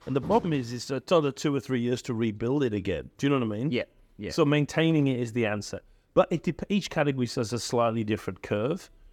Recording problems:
none

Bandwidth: 18.5 kHz